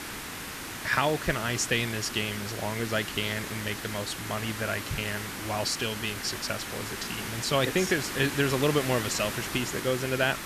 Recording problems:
hiss; loud; throughout; 6 dB below the speech

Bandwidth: 14.5 kHz